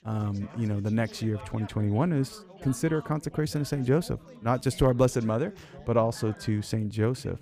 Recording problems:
background chatter; noticeable; throughout; 3 voices, 20 dB below the speech

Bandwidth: 15 kHz